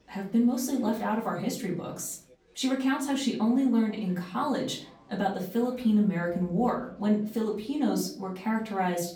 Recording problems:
off-mic speech; far
room echo; slight; dies away in 0.4 s
chatter from many people; faint; throughout; 30 dB below the speech

